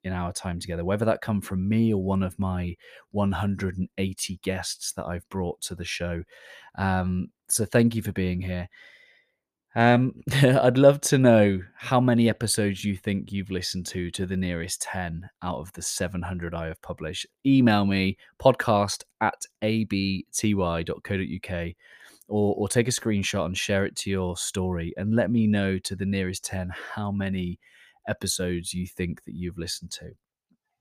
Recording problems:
none

